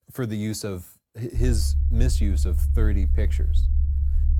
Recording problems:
low rumble; loud; from 1.5 s on; 8 dB below the speech

